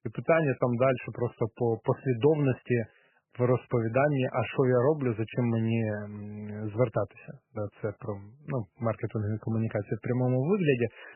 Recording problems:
garbled, watery; badly; nothing above 3 kHz

